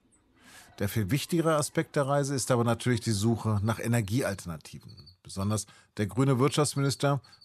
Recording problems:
animal sounds; faint; throughout; 30 dB below the speech

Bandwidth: 13.5 kHz